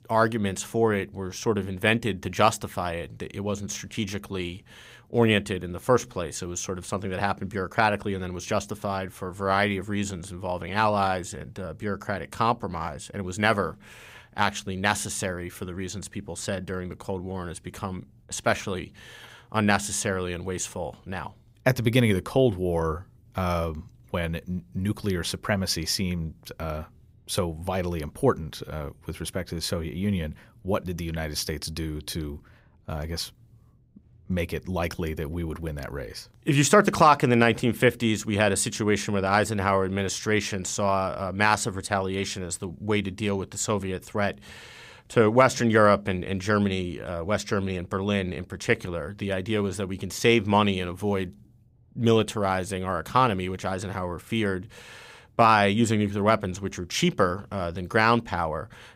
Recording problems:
none

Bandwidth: 15.5 kHz